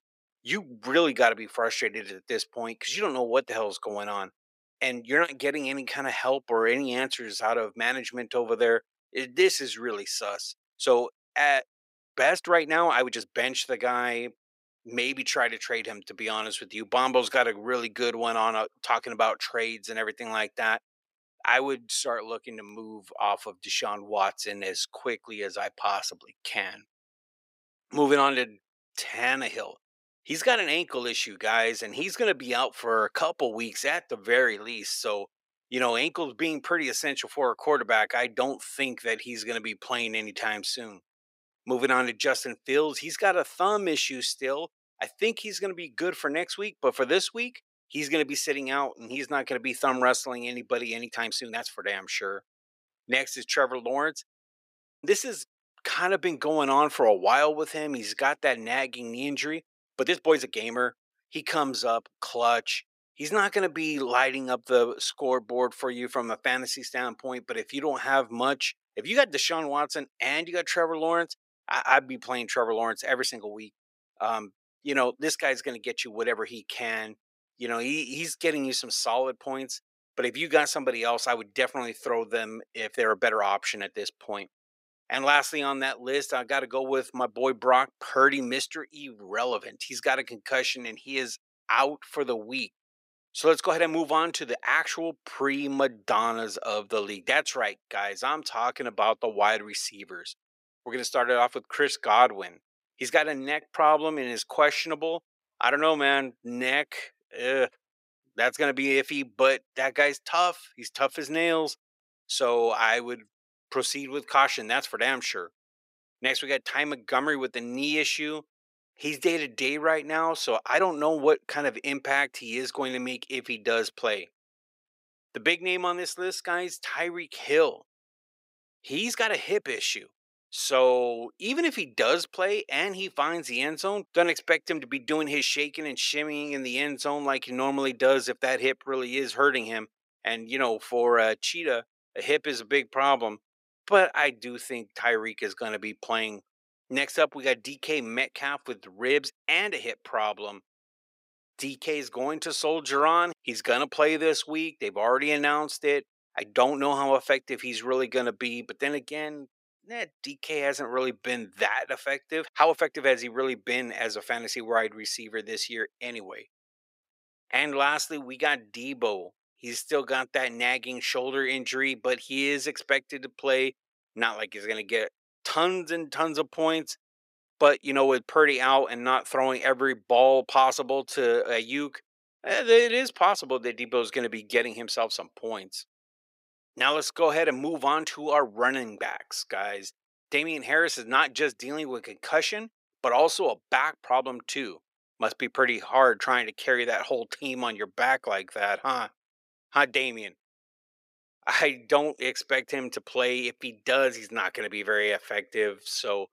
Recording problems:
thin; somewhat; fading below 350 Hz
uneven, jittery; strongly; from 12 s to 3:14

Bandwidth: 15.5 kHz